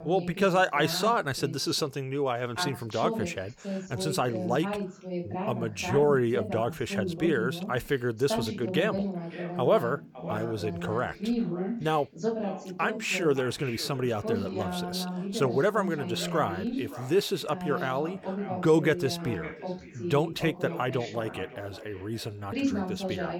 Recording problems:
echo of what is said; noticeable; from 9 s on; 560 ms later, 15 dB below the speech
voice in the background; loud; throughout; 6 dB below the speech

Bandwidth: 18 kHz